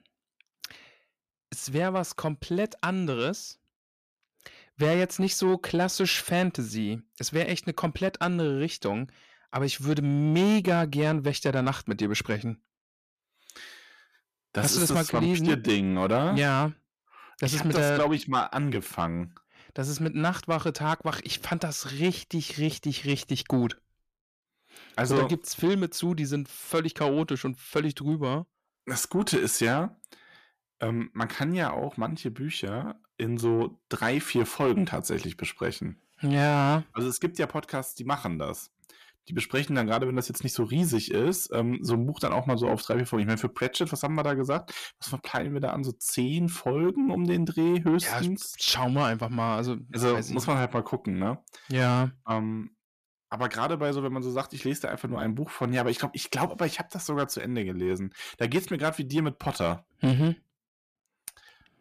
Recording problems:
distortion; slight; 10 dB below the speech

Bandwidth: 14.5 kHz